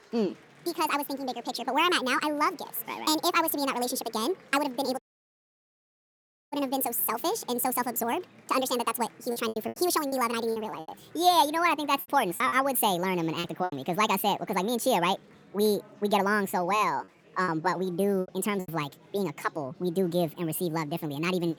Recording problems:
wrong speed and pitch; too fast and too high; 1.6 times normal speed
chatter from many people; faint; throughout; 25 dB below the speech
audio cutting out; at 5 s for 1.5 s
choppy; very; from 9.5 to 14 s and from 17 to 19 s; 11% of the speech affected

